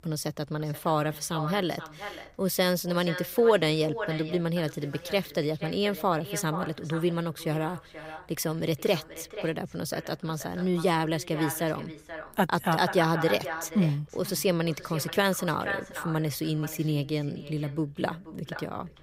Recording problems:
echo of what is said; strong; throughout; 480 ms later, 10 dB below the speech

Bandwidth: 15.5 kHz